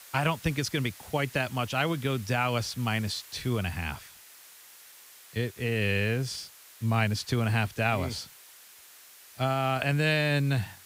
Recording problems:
hiss; noticeable; throughout; 20 dB below the speech

